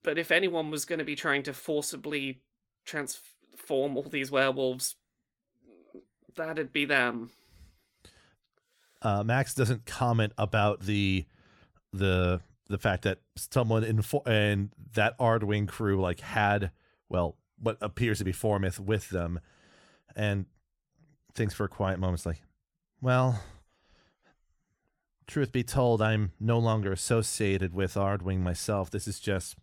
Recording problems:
none

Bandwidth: 17.5 kHz